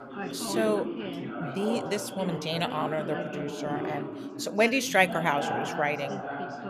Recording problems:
background chatter; loud; throughout; 3 voices, 5 dB below the speech

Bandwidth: 14.5 kHz